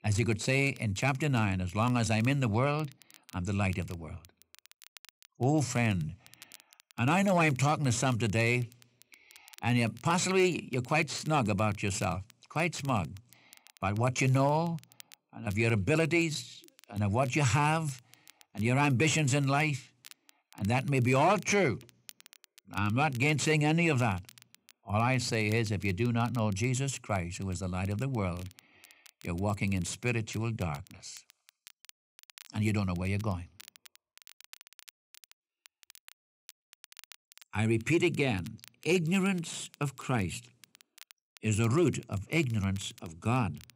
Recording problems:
crackle, like an old record; faint; 25 dB below the speech

